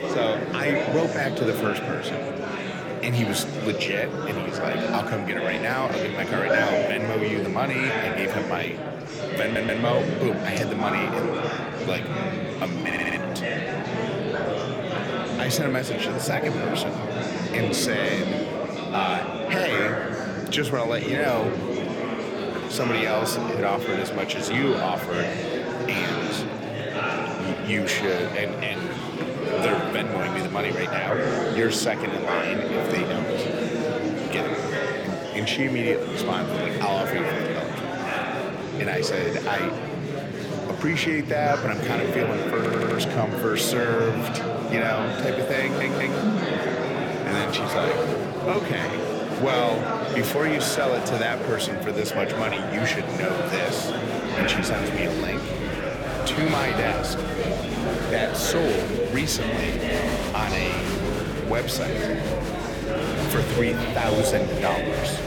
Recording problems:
murmuring crowd; very loud; throughout; as loud as the speech
audio stuttering; 4 times, first at 9.5 s

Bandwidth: 18 kHz